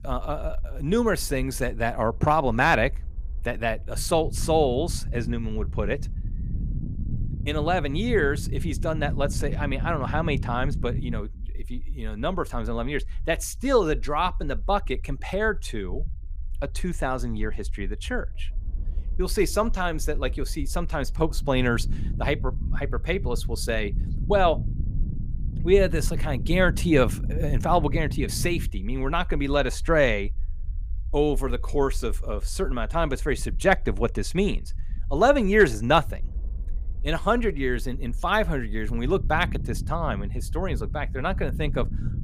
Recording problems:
low rumble; faint; throughout; 20 dB below the speech

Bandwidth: 15 kHz